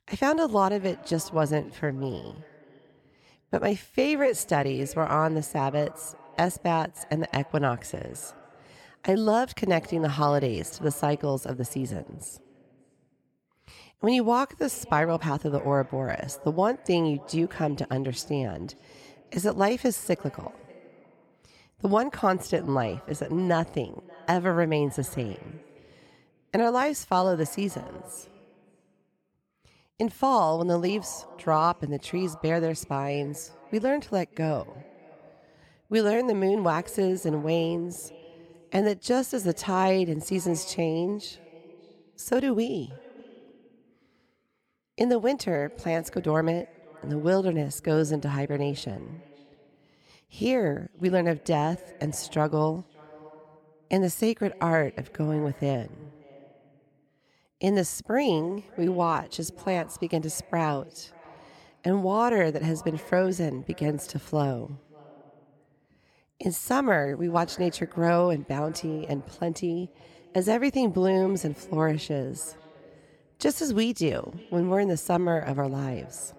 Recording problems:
echo of what is said; faint; throughout; 580 ms later, 25 dB below the speech

